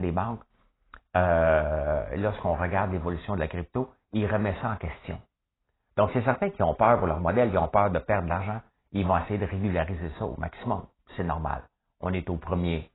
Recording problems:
garbled, watery; badly; nothing above 4 kHz
abrupt cut into speech; at the start

